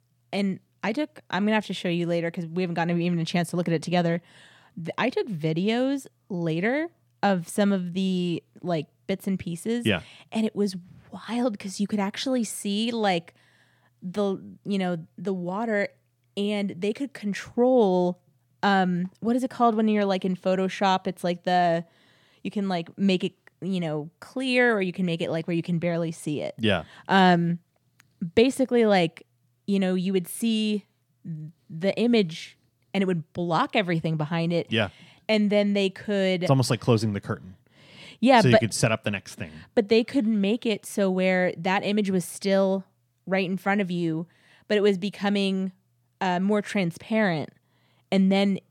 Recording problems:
none

